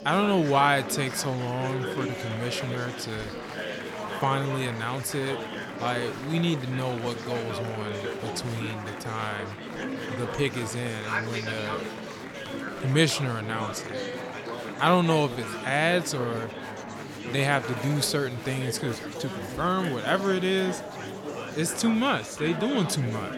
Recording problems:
murmuring crowd; loud; throughout; 7 dB below the speech

